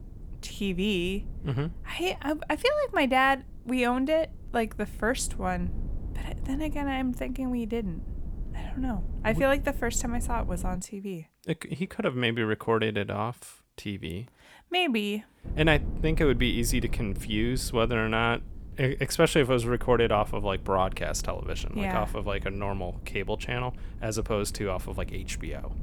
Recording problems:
low rumble; faint; until 11 s and from 15 s on; 25 dB below the speech

